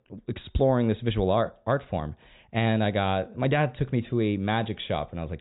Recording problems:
high frequencies cut off; severe; nothing above 4 kHz

